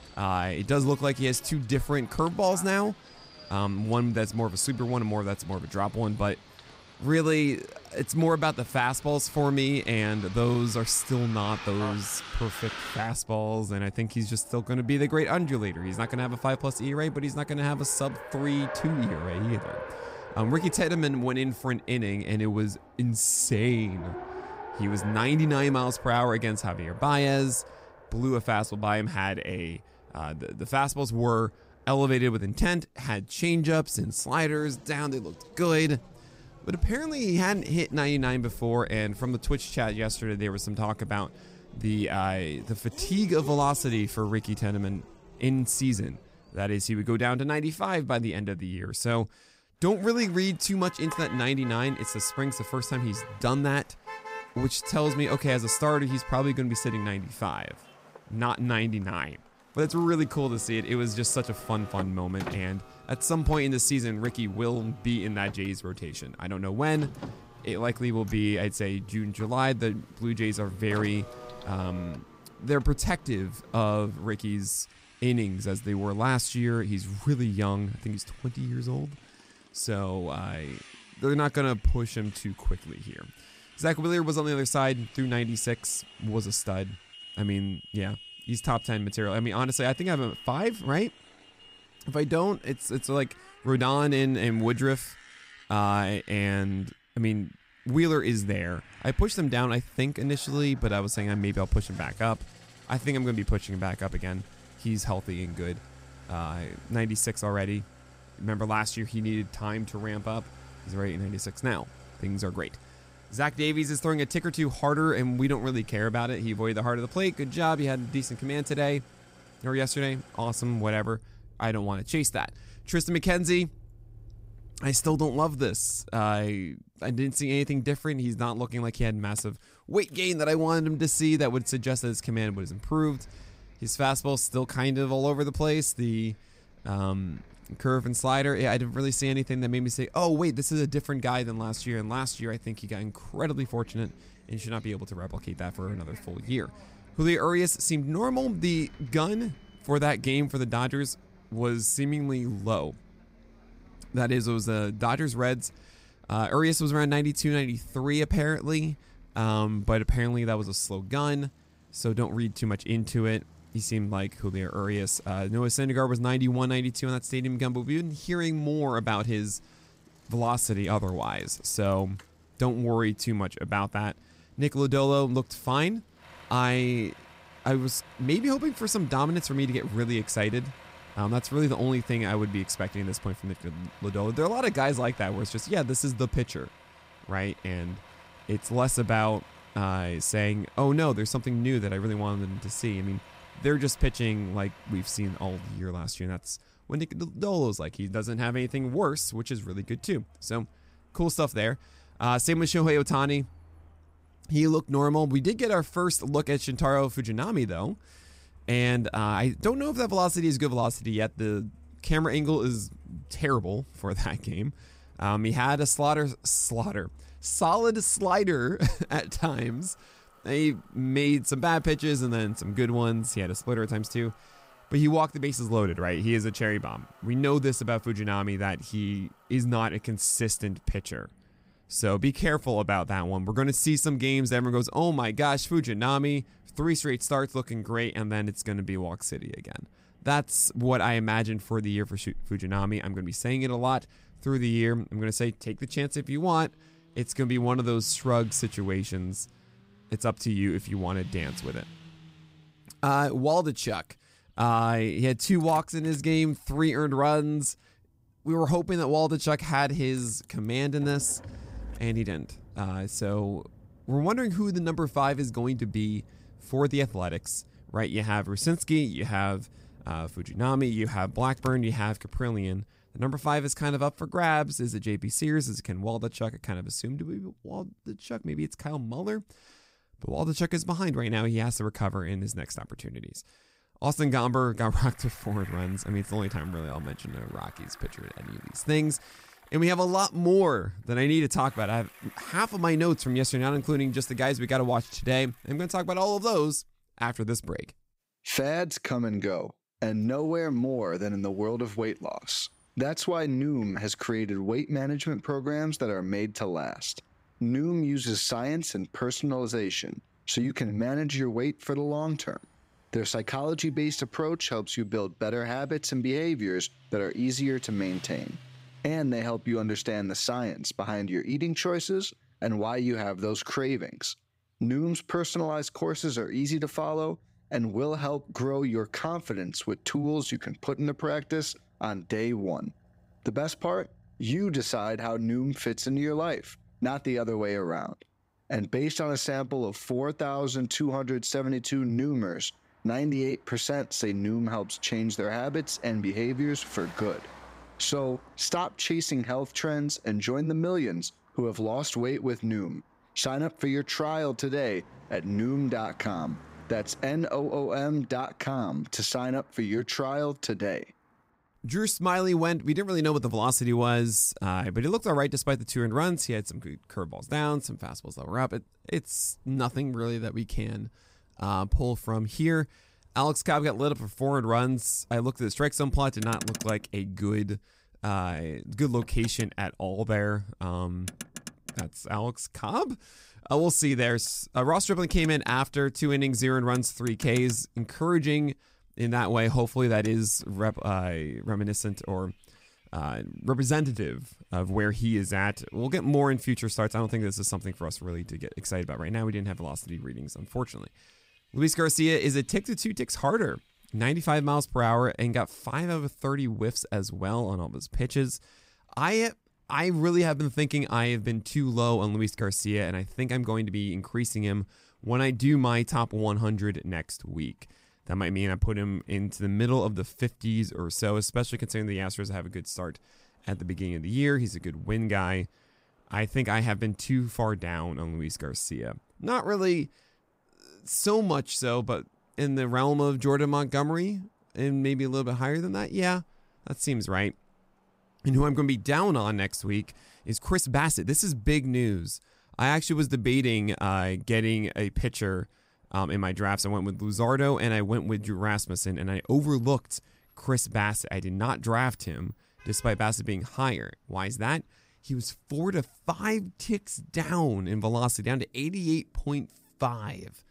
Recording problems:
traffic noise; noticeable; throughout; 20 dB below the speech
uneven, jittery; strongly; from 59 s to 7:21

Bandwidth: 15.5 kHz